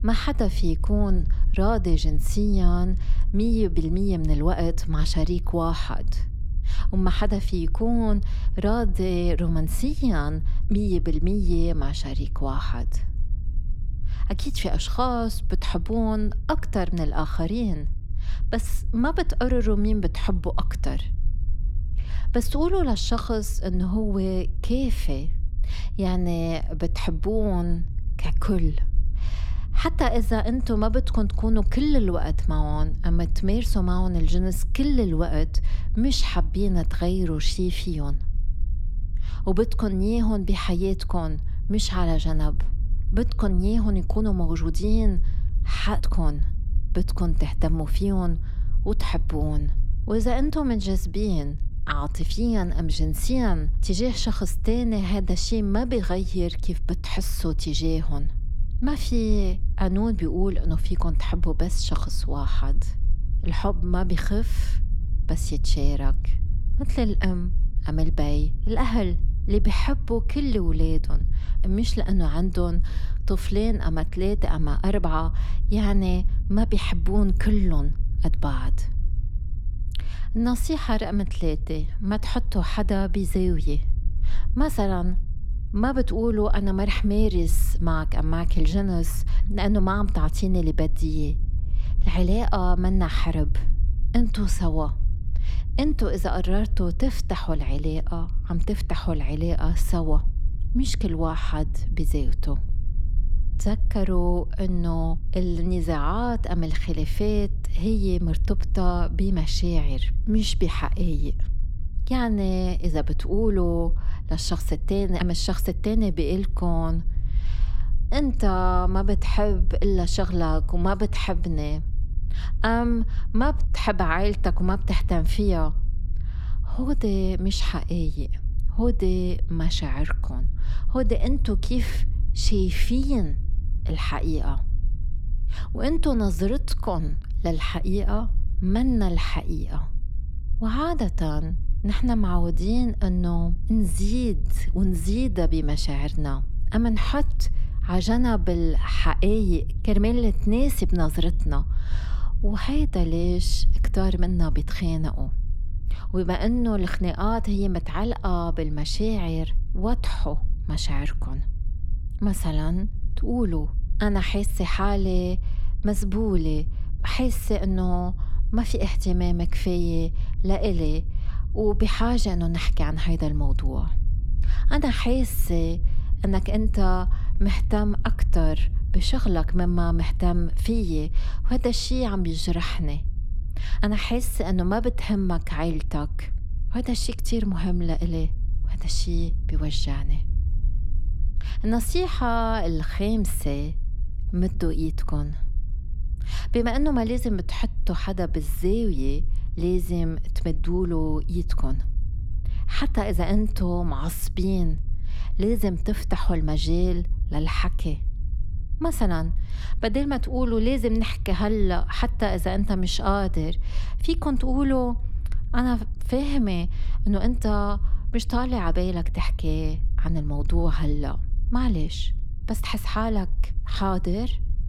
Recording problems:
low rumble; noticeable; throughout; 20 dB below the speech

